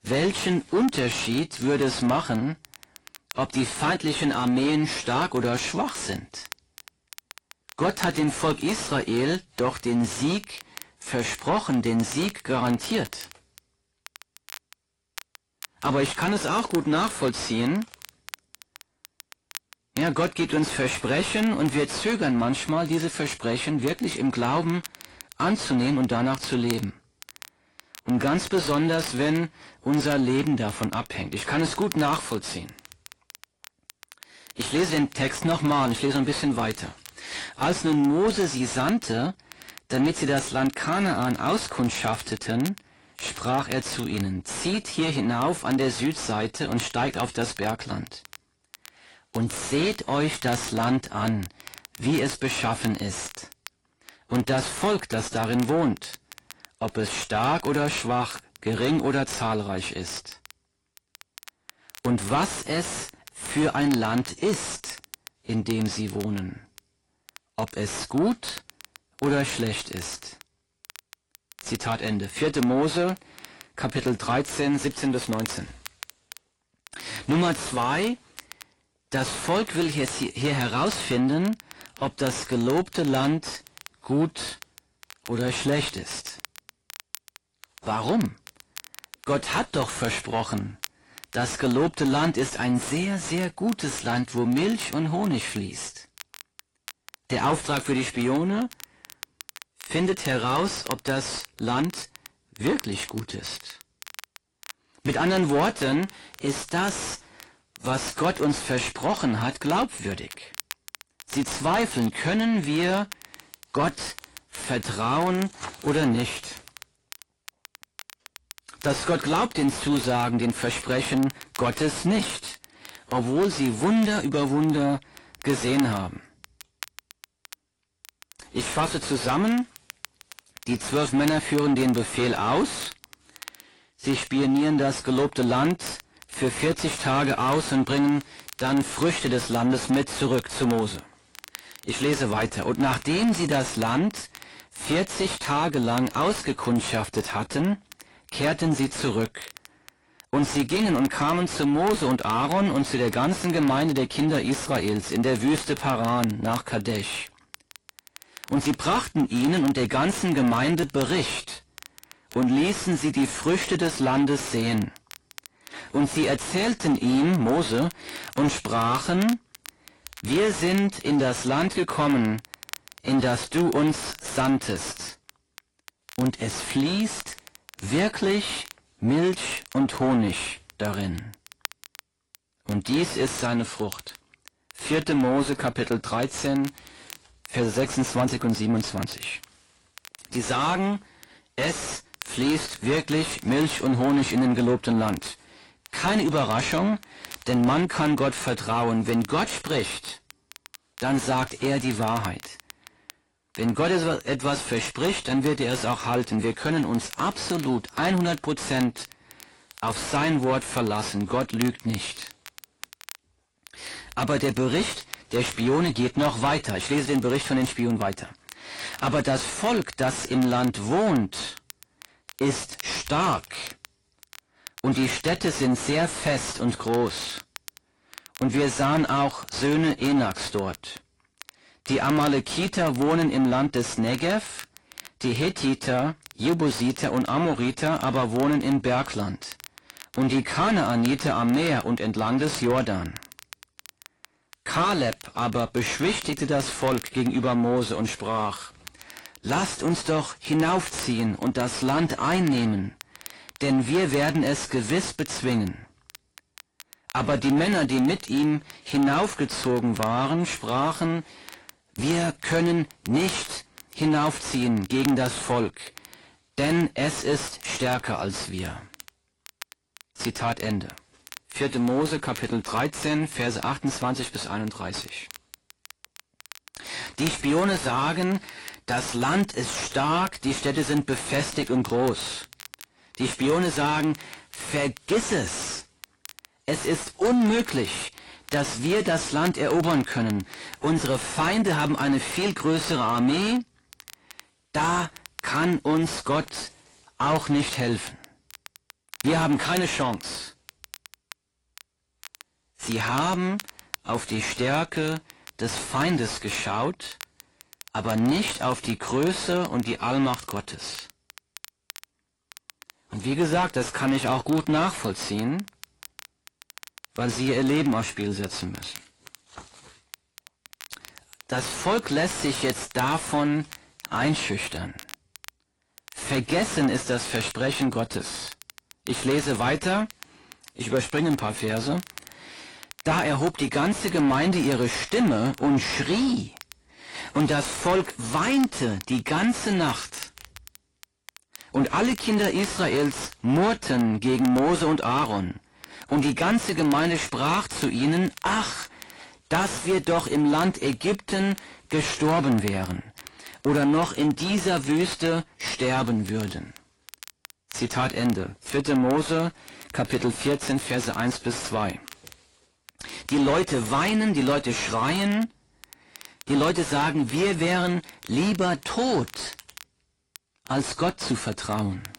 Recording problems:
distortion; heavy; 6 dB below the speech
garbled, watery; slightly; nothing above 10.5 kHz
crackle, like an old record; noticeable; 20 dB below the speech

